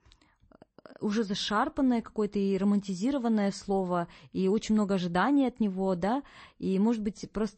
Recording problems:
garbled, watery; slightly; nothing above 8 kHz

